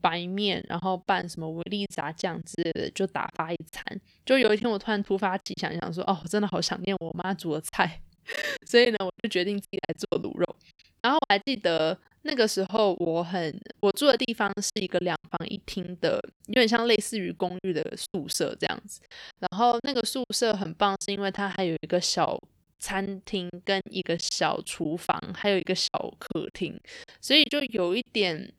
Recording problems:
choppy; very; 13% of the speech affected

